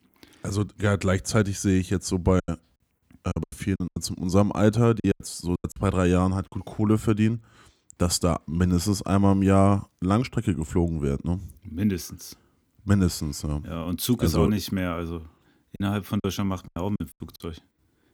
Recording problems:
choppy; very; from 2.5 to 6.5 s and from 16 to 17 s; 16% of the speech affected

